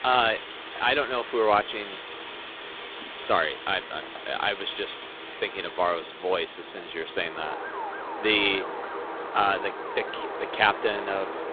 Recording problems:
phone-call audio; poor line
wind in the background; loud; throughout; 10 dB below the speech
siren; noticeable; from 7.5 to 10 s; peak 9 dB below the speech

